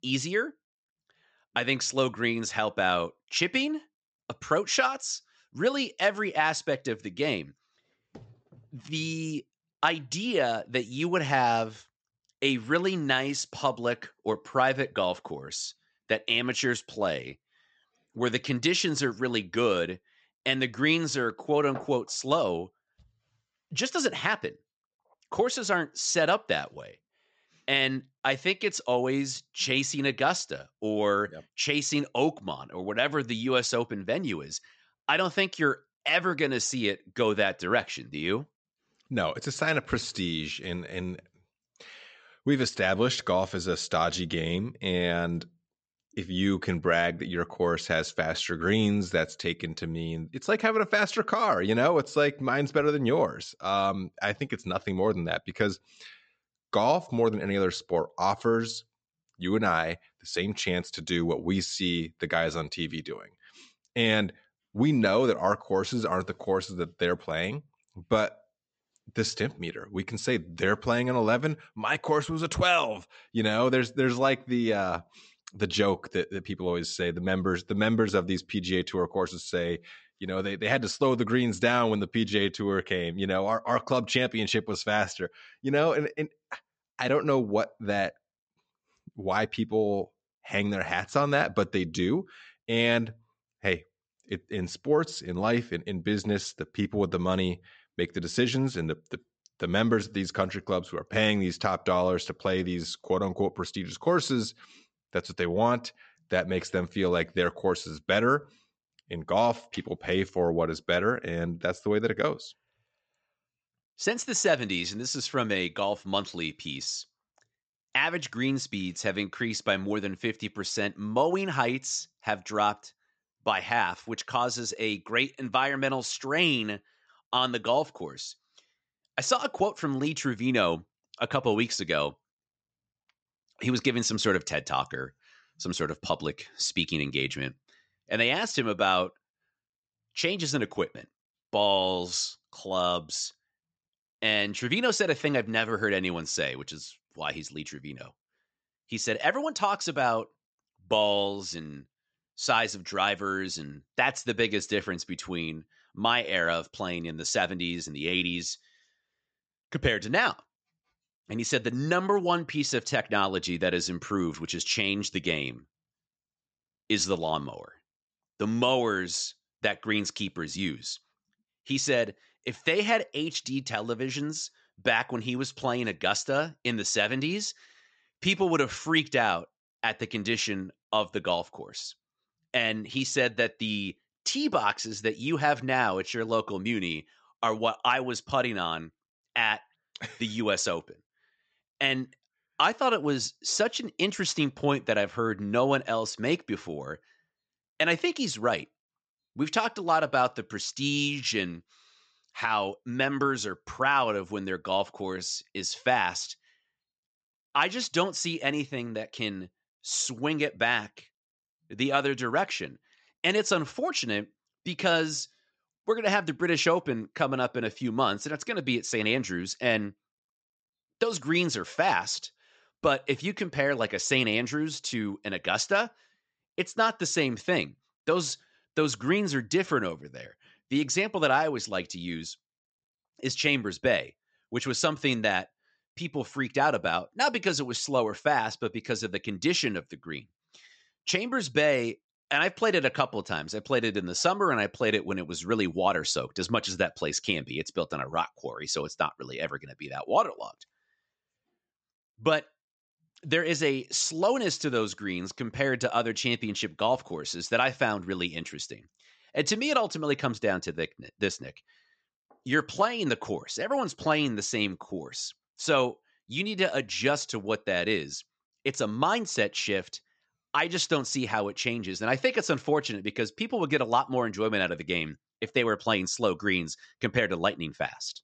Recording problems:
high frequencies cut off; noticeable; nothing above 8 kHz

